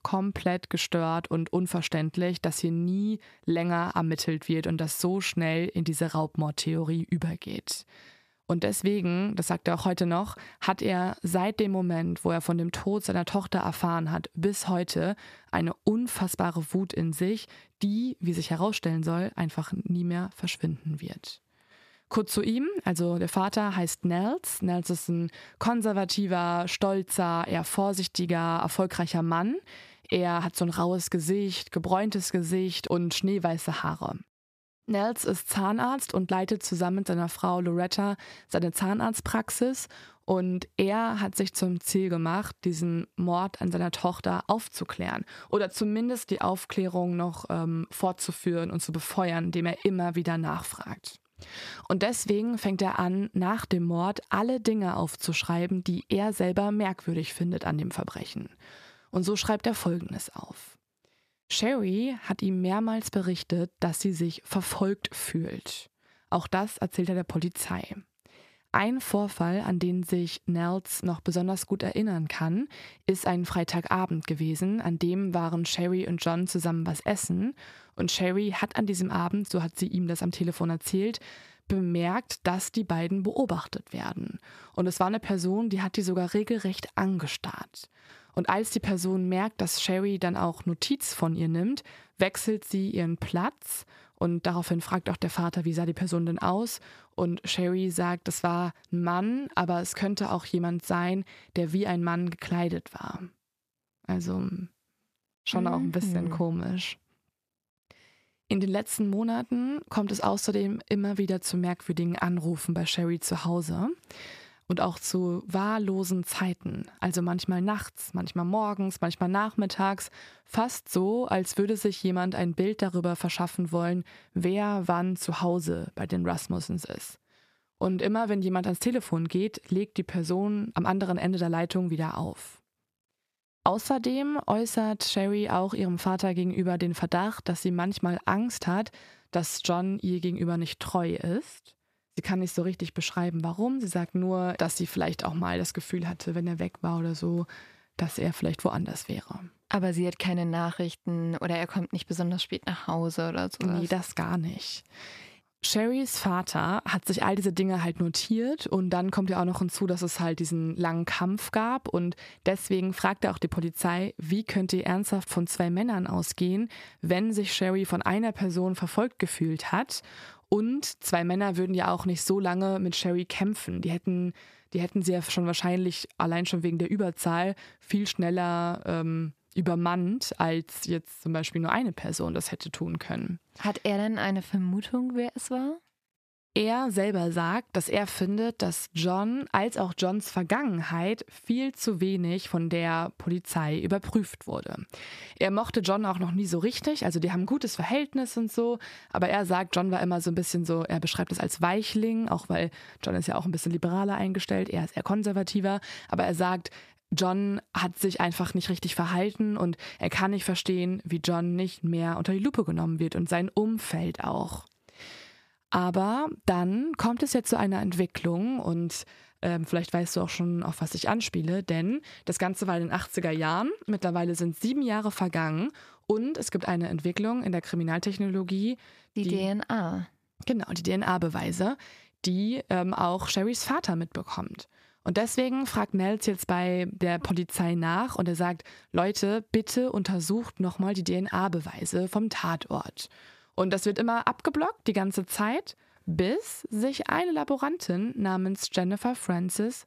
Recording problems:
squashed, flat; somewhat

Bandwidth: 14.5 kHz